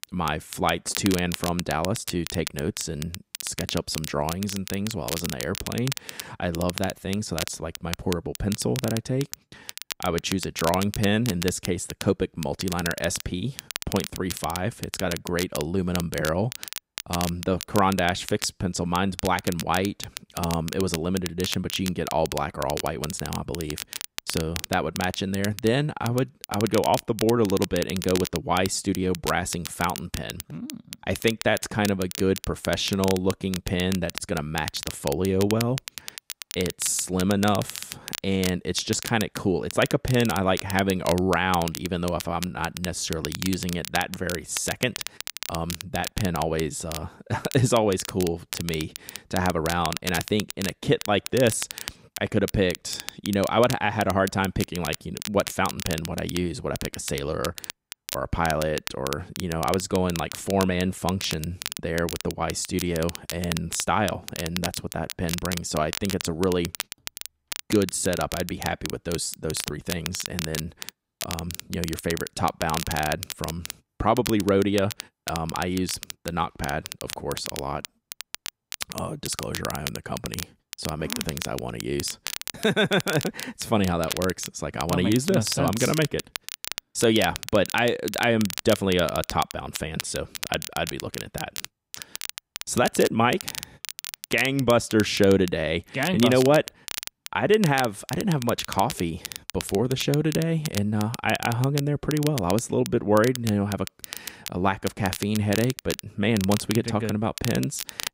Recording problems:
crackle, like an old record; loud; 9 dB below the speech

